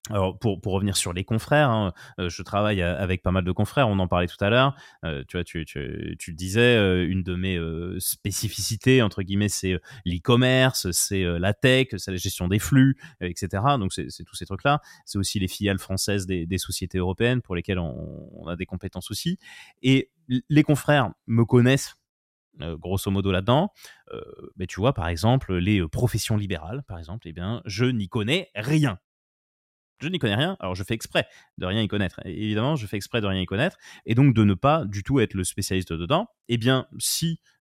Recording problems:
none

